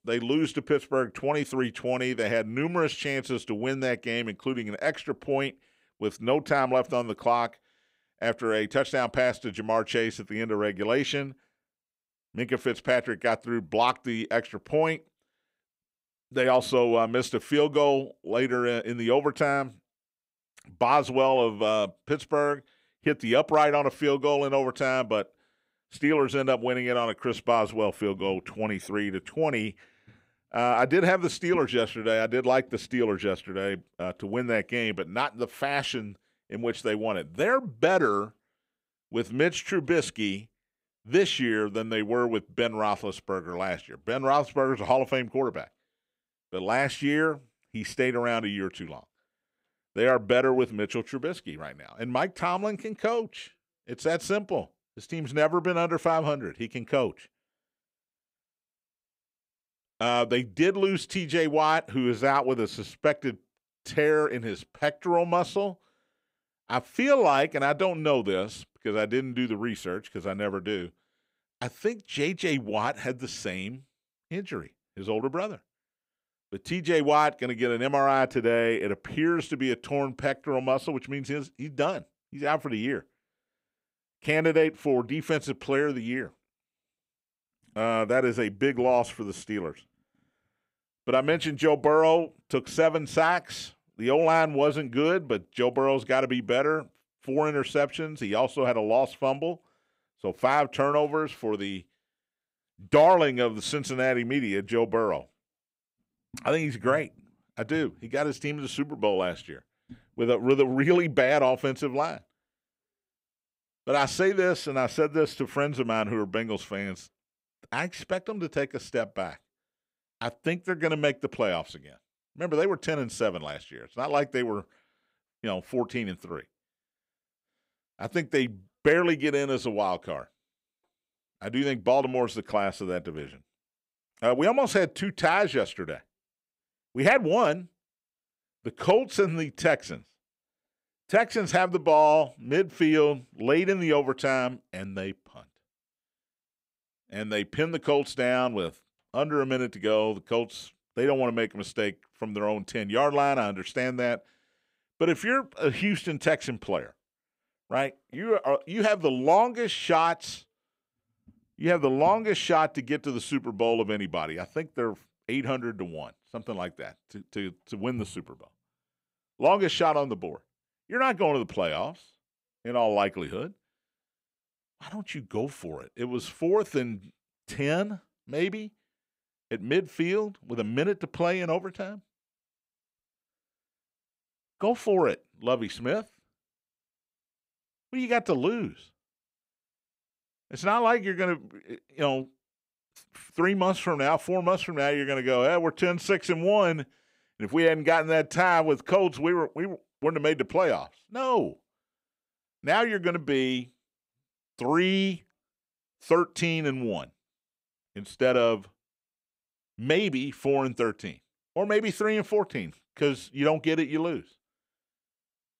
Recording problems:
none

